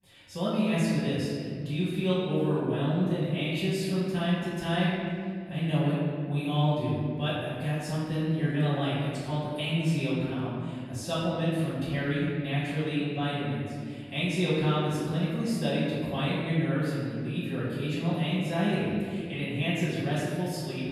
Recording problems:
room echo; strong; dies away in 2.1 s
off-mic speech; far

